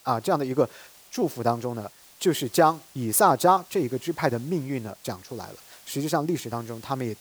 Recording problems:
hiss; faint; throughout; 25 dB below the speech

